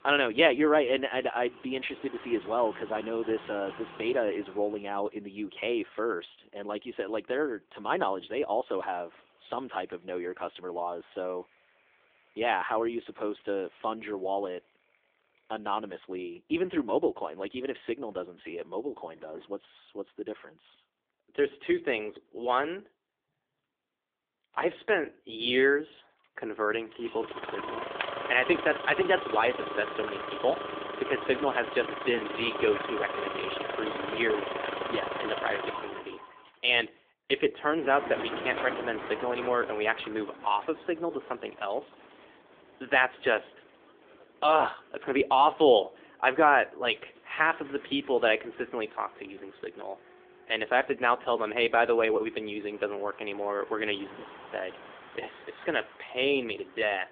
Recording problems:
phone-call audio; nothing above 3.5 kHz
traffic noise; loud; throughout; 9 dB below the speech

